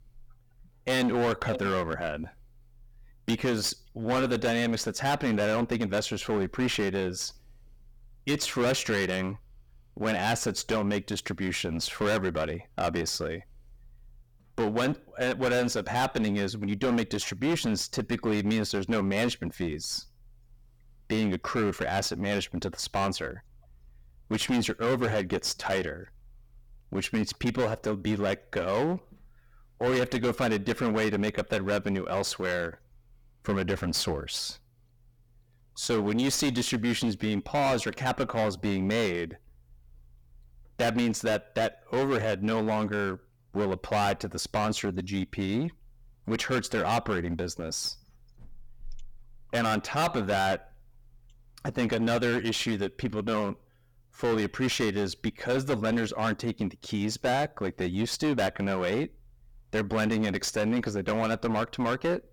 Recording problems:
distortion; heavy; 14% of the sound clipped

